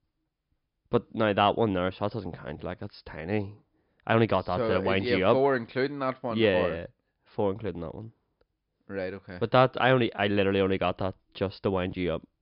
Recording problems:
high frequencies cut off; noticeable; nothing above 5.5 kHz

